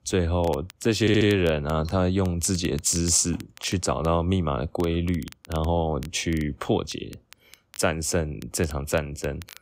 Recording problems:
crackle, like an old record; faint; 25 dB below the speech
audio stuttering; at 1 s

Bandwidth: 15.5 kHz